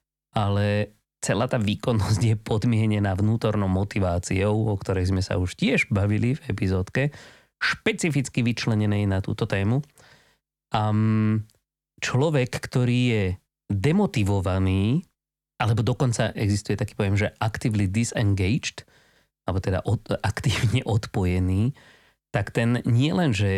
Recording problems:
abrupt cut into speech; at the end

